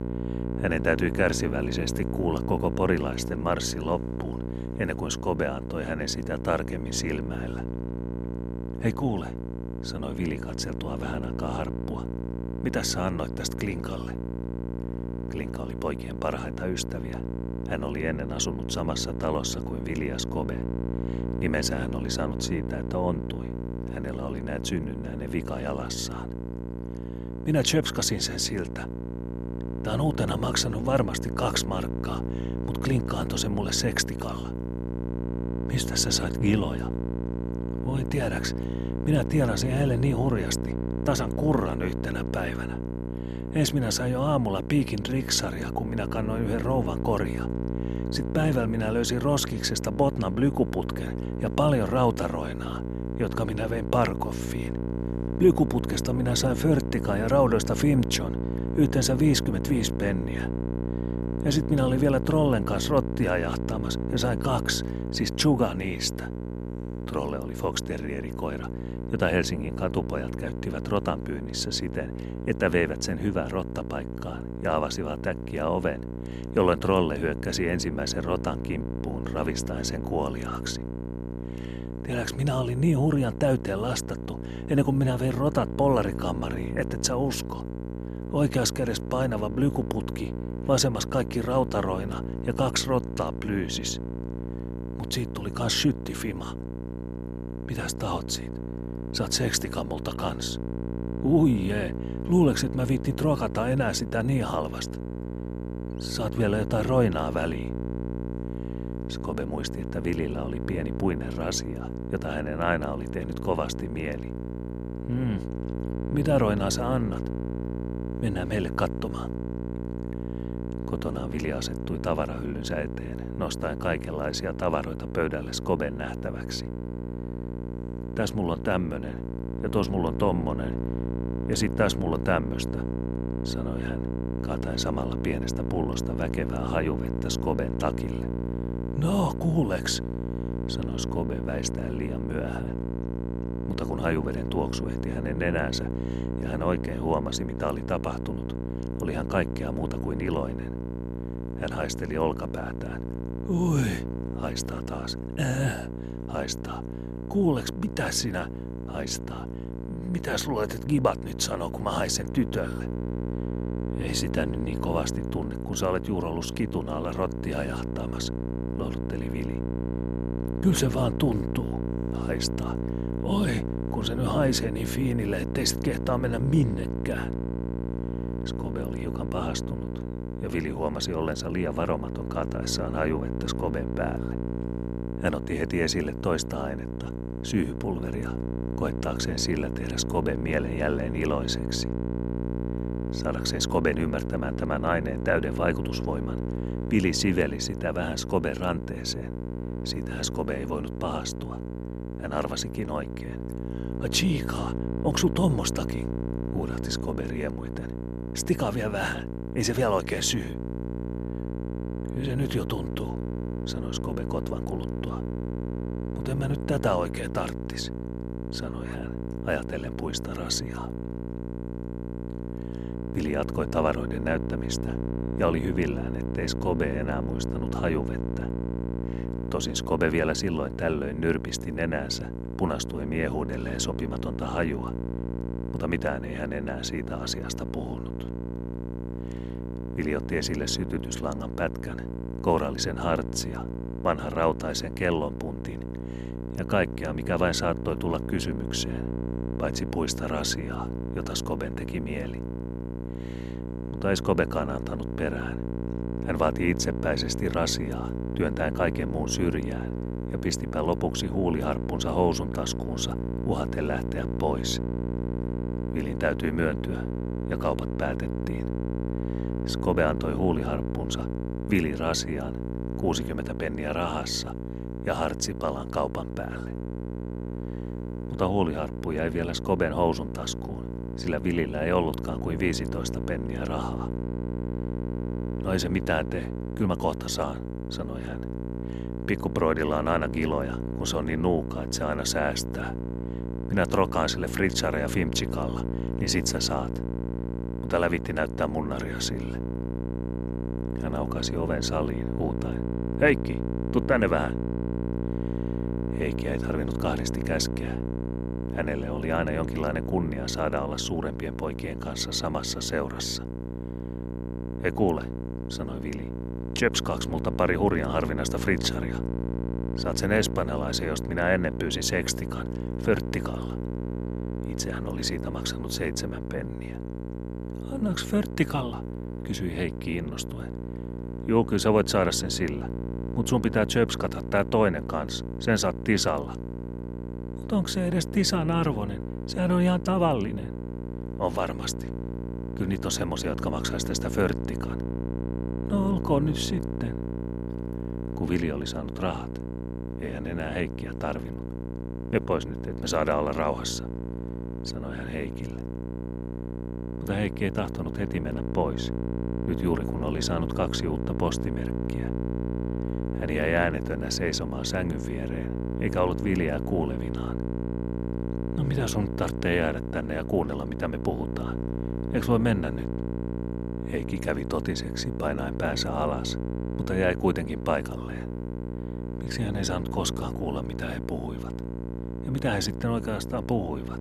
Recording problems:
electrical hum; loud; throughout; 60 Hz, 9 dB below the speech

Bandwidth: 13.5 kHz